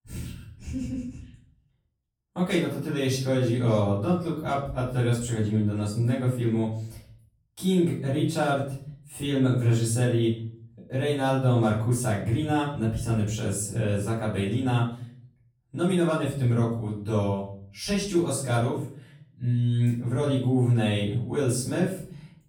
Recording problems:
off-mic speech; far
room echo; noticeable; dies away in 0.5 s

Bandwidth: 18 kHz